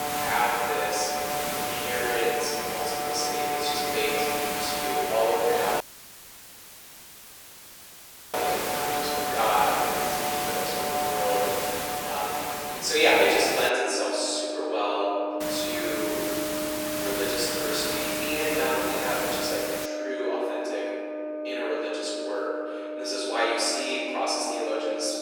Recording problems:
room echo; strong; dies away in 2.3 s
off-mic speech; far
thin; very; fading below 400 Hz
background music; loud; throughout; 4 dB below the speech
hiss; loud; until 14 s and from 15 to 20 s; 3 dB below the speech
audio cutting out; filled with static; at 6 s for 2.5 s

